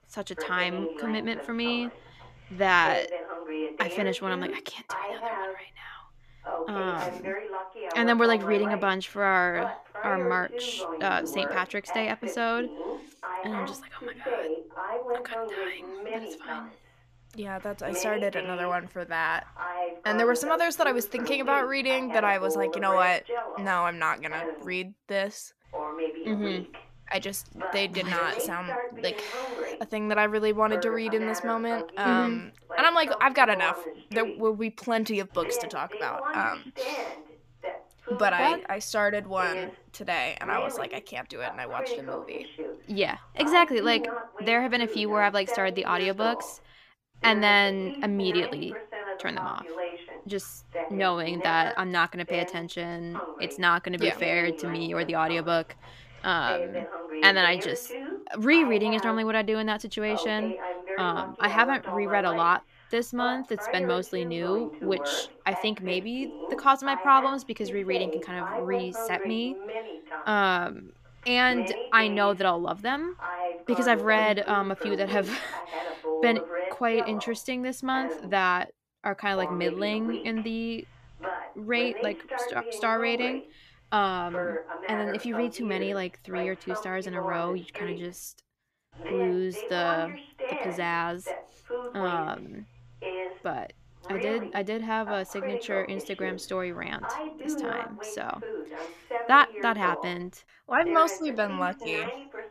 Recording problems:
voice in the background; loud; throughout; 8 dB below the speech

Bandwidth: 14.5 kHz